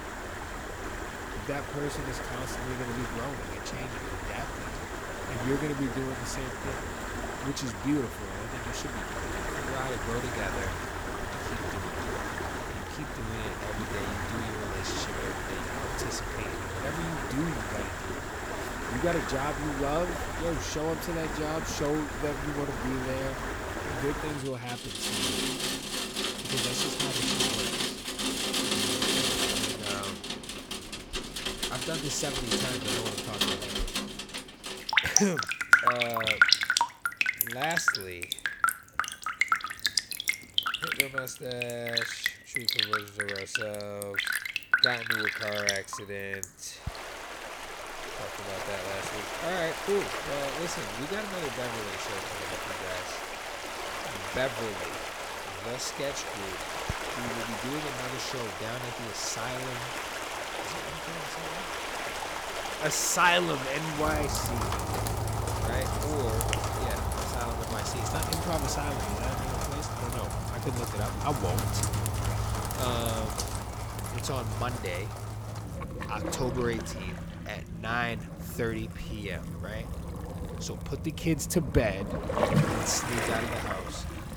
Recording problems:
rain or running water; very loud; throughout; 3 dB above the speech
animal sounds; faint; throughout; 25 dB below the speech

